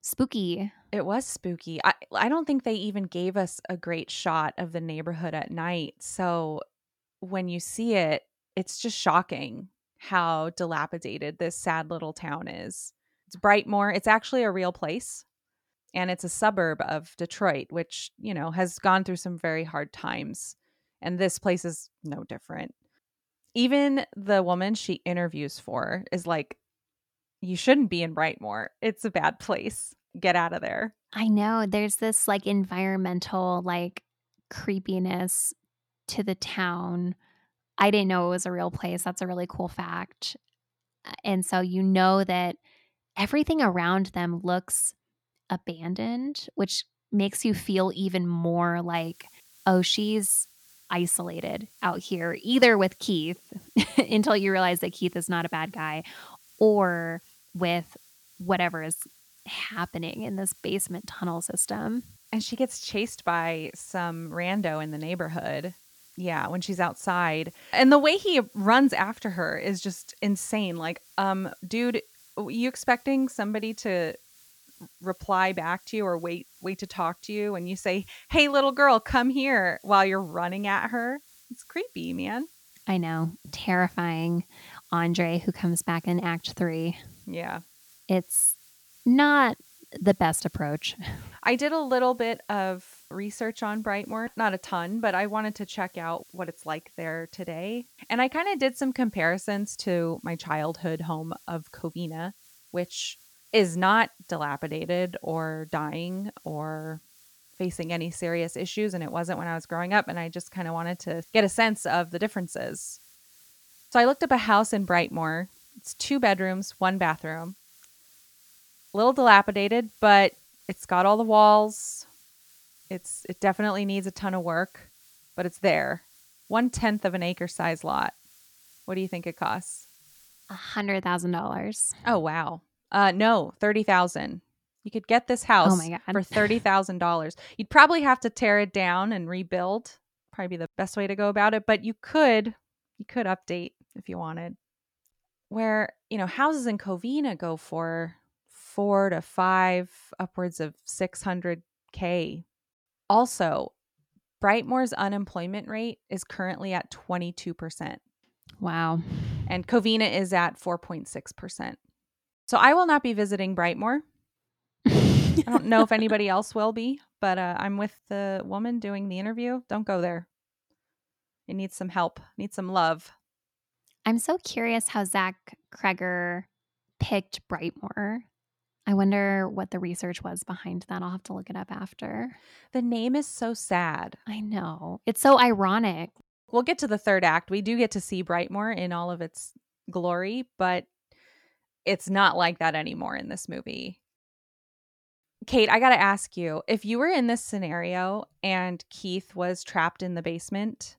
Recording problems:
hiss; faint; from 49 s to 2:11; 30 dB below the speech

